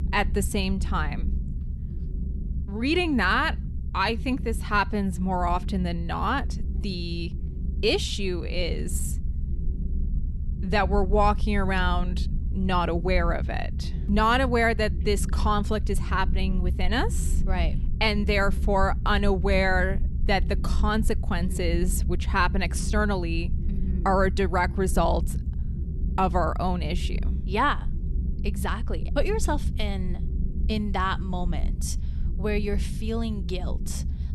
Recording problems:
low rumble; noticeable; throughout; 20 dB below the speech

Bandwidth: 15.5 kHz